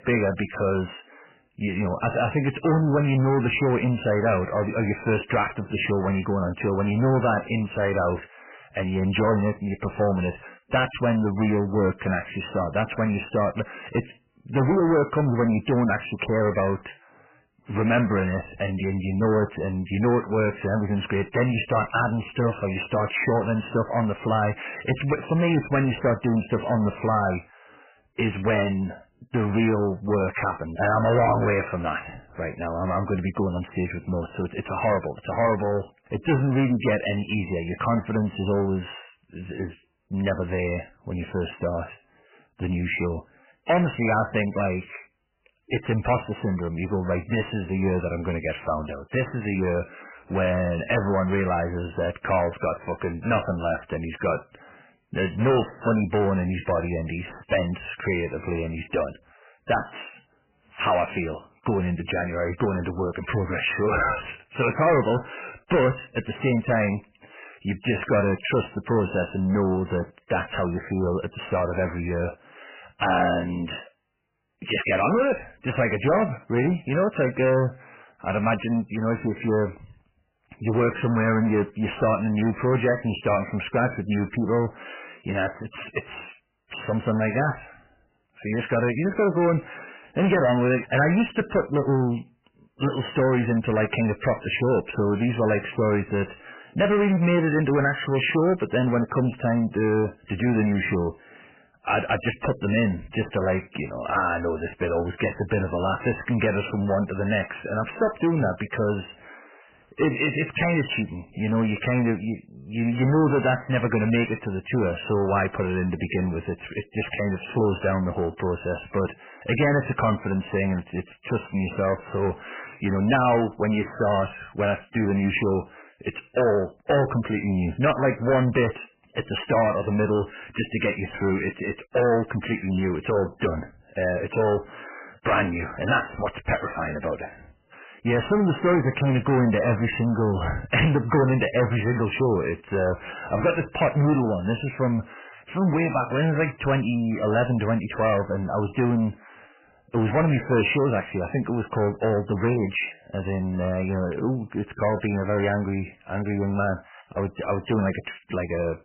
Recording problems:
distortion; heavy; 7 dB below the speech
garbled, watery; badly; nothing above 3 kHz

